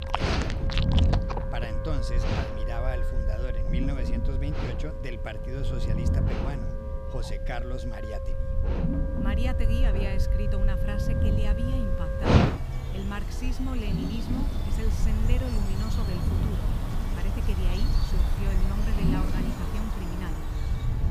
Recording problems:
animal sounds; very loud; throughout; 5 dB above the speech
background music; loud; throughout; 2 dB below the speech
low rumble; loud; throughout; 3 dB below the speech

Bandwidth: 15 kHz